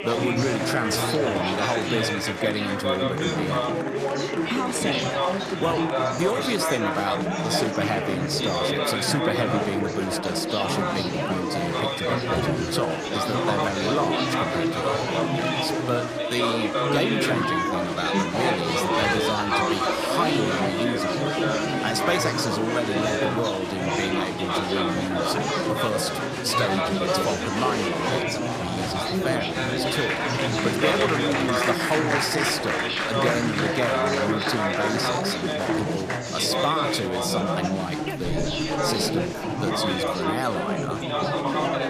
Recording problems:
chatter from many people; very loud; throughout; 4 dB above the speech

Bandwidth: 14.5 kHz